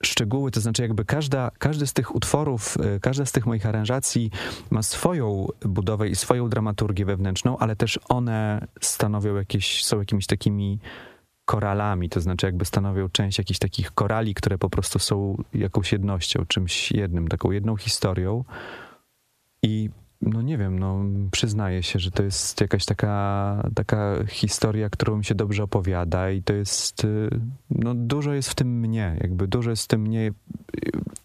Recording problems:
squashed, flat; heavily

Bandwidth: 14.5 kHz